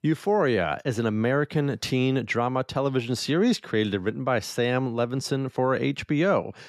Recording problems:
none

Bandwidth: 13.5 kHz